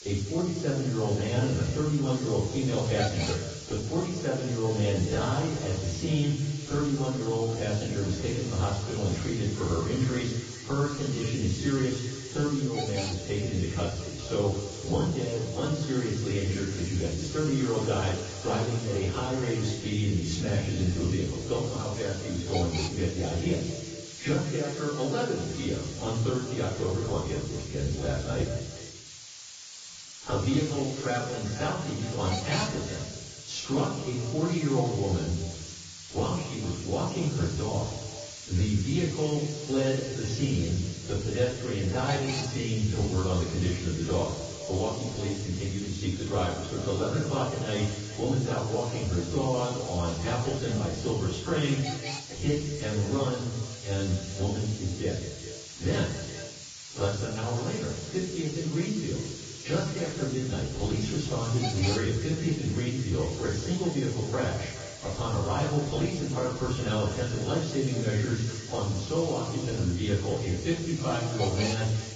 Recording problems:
off-mic speech; far
garbled, watery; badly; nothing above 7.5 kHz
echo of what is said; noticeable; throughout; 200 ms later, 10 dB below the speech
room echo; noticeable; dies away in 0.5 s
hiss; noticeable; throughout; 10 dB below the speech

